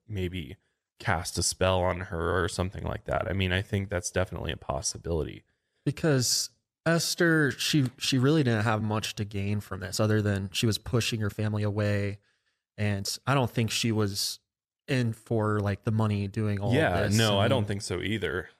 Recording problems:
uneven, jittery; strongly; from 1 to 16 s

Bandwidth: 14.5 kHz